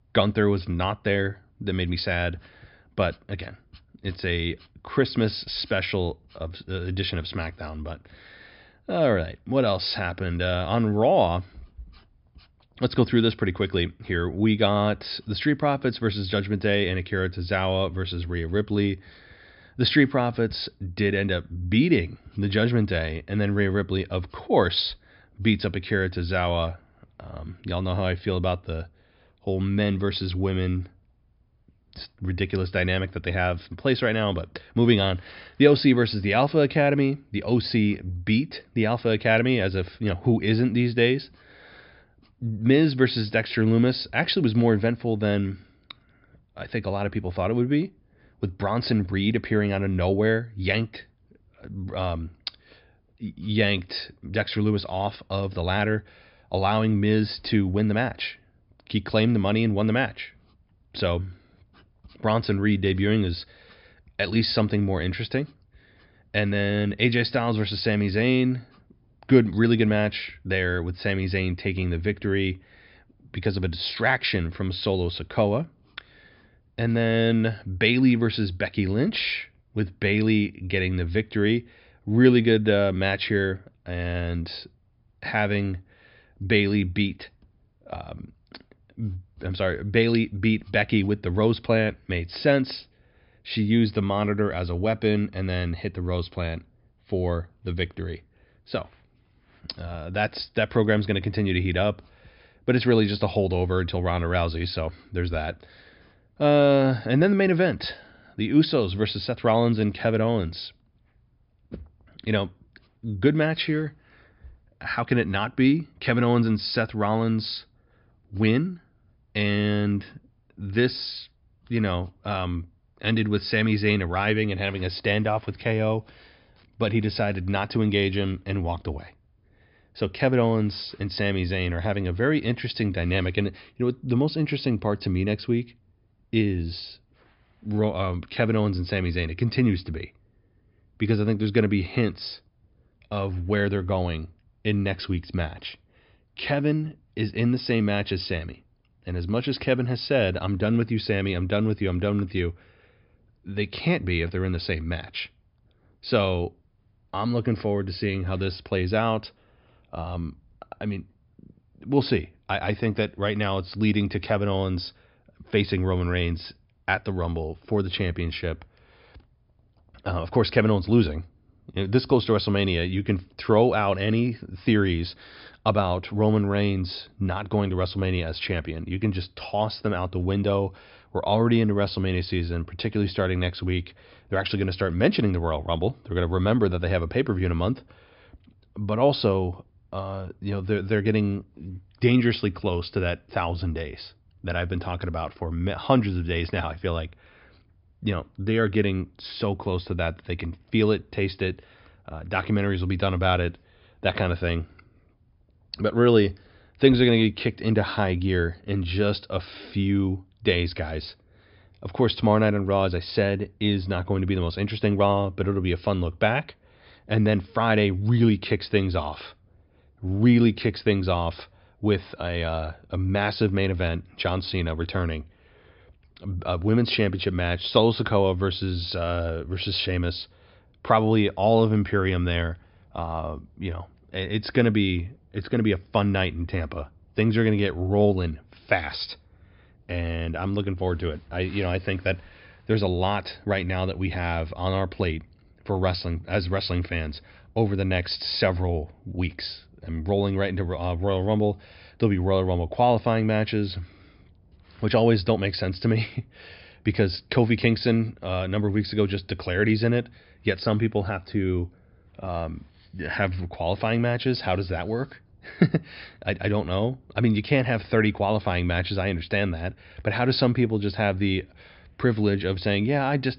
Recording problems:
high frequencies cut off; noticeable; nothing above 5.5 kHz

